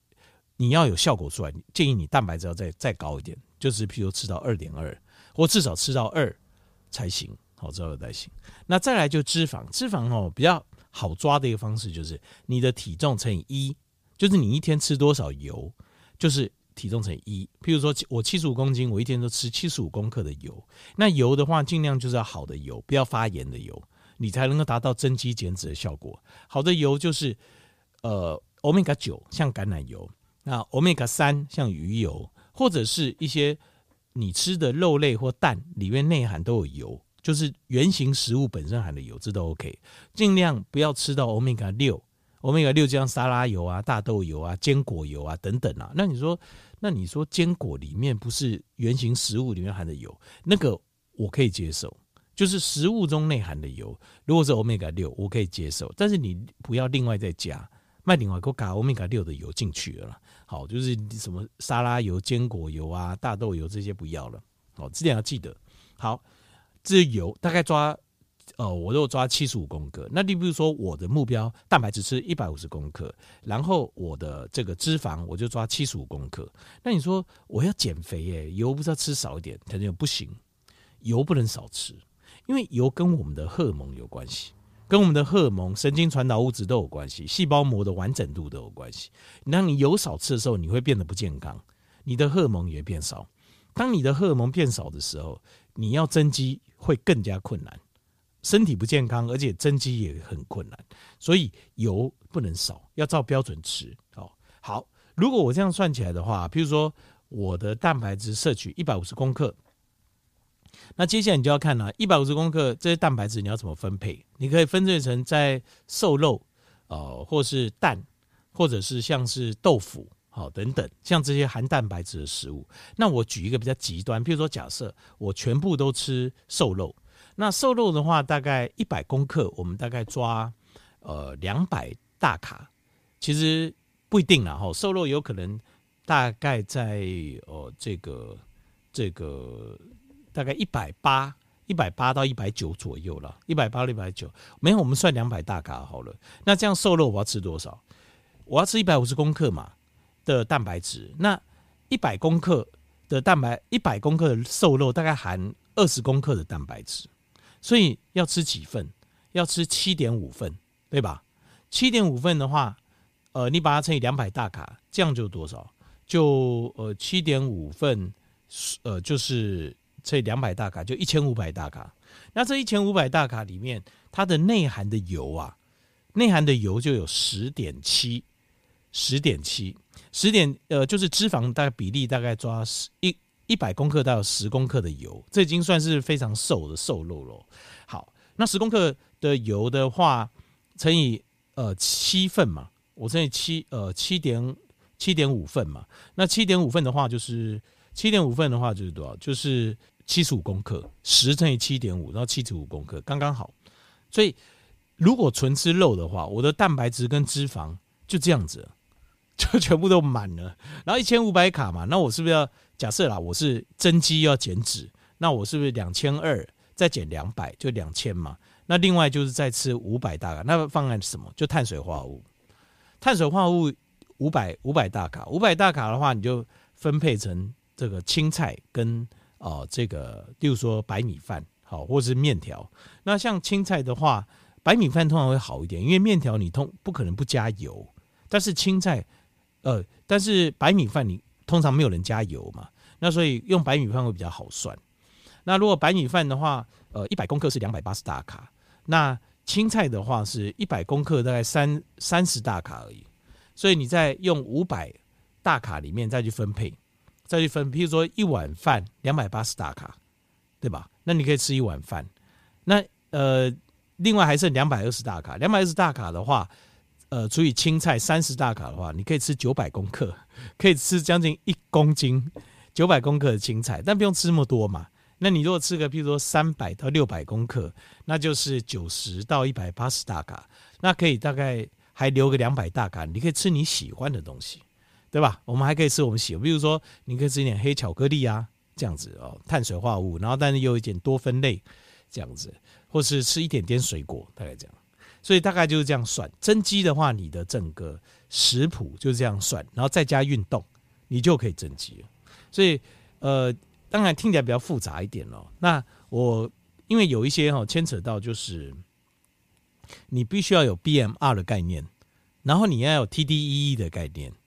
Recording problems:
uneven, jittery; strongly; from 1:12 to 4:19

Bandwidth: 15 kHz